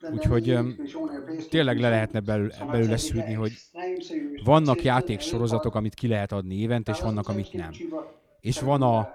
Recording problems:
voice in the background; loud; throughout; 9 dB below the speech

